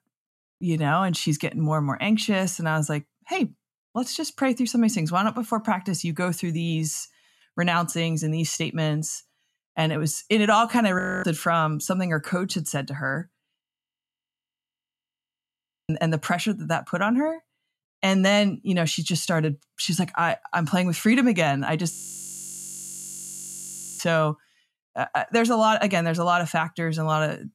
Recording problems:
audio freezing; at 11 s, at 14 s for 2.5 s and at 22 s for 2 s

